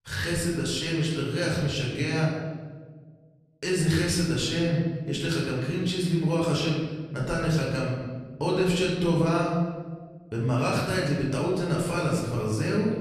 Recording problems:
off-mic speech; far
room echo; noticeable; dies away in 1.3 s

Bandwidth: 14 kHz